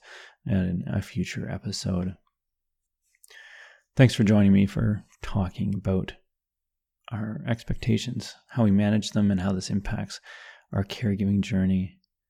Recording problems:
none

